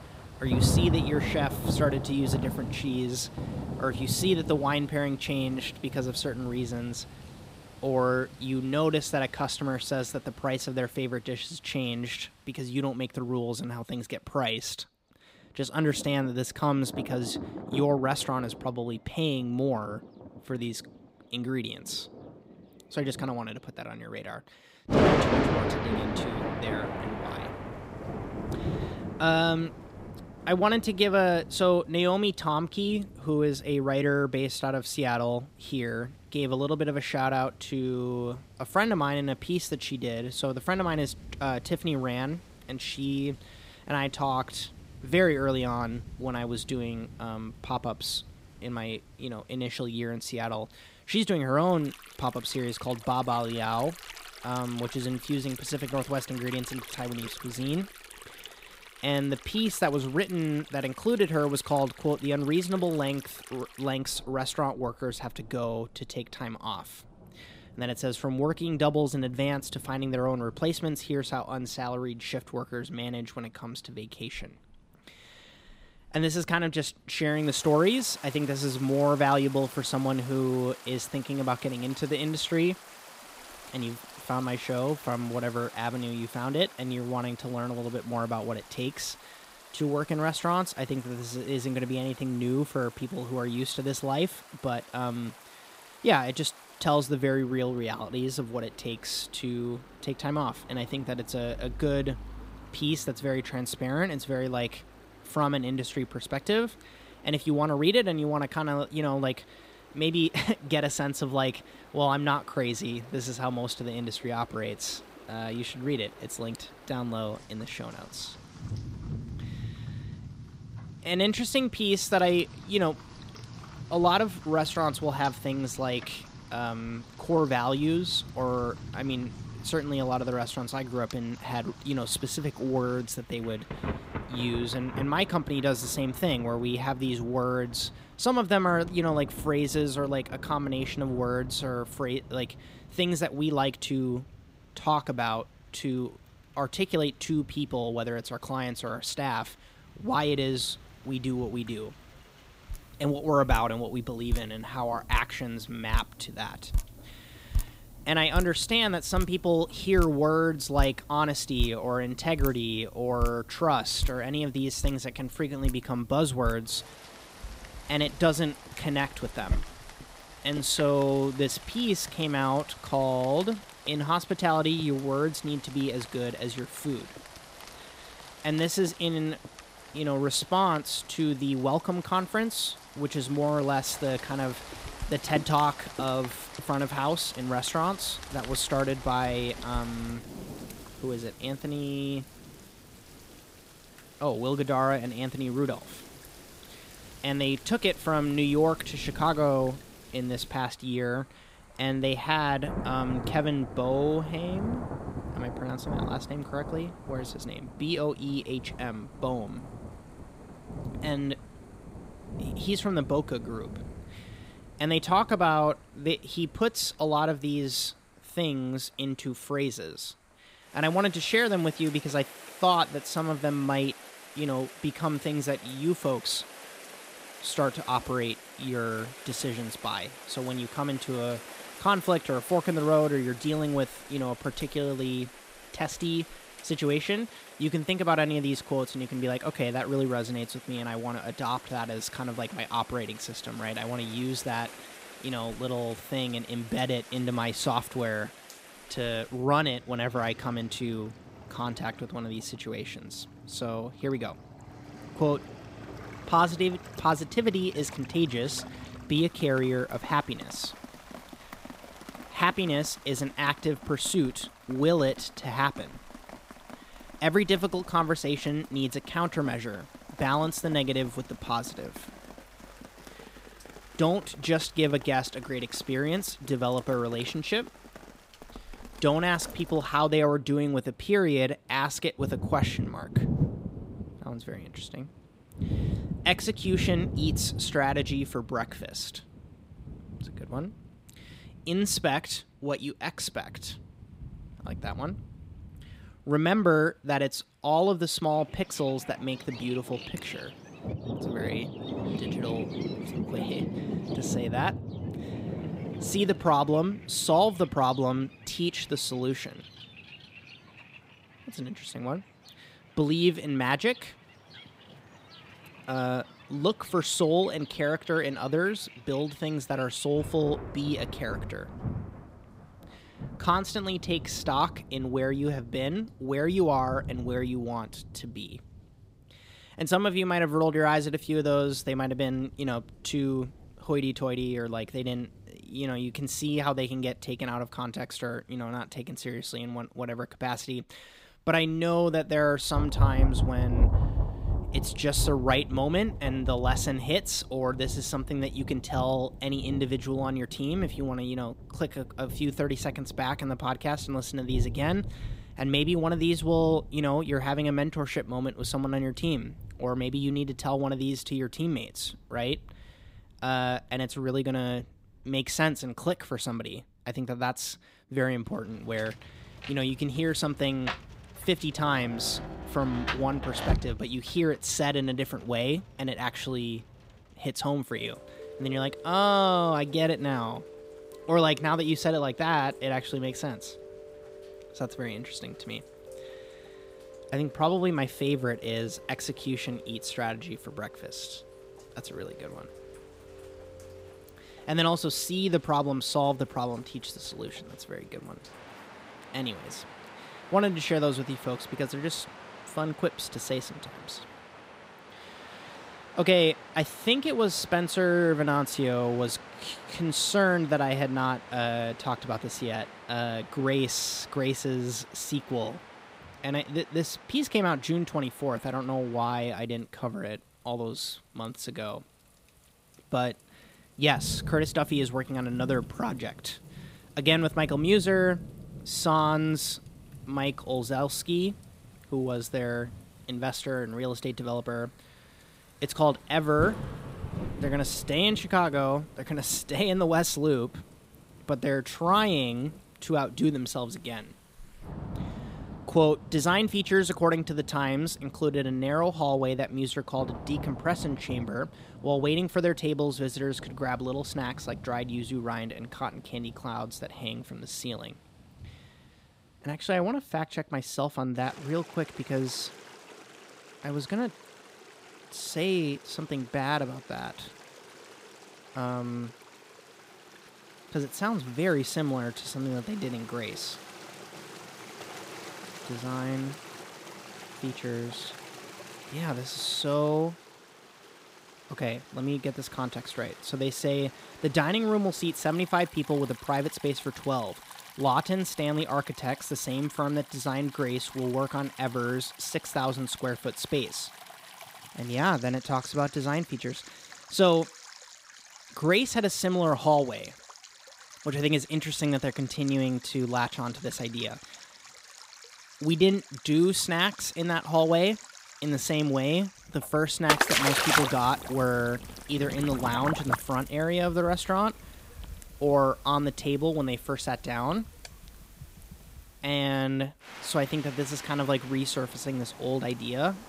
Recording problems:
rain or running water; noticeable; throughout; 10 dB below the speech

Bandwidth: 15.5 kHz